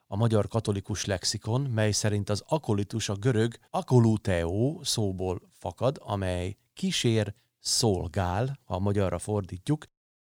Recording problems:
none

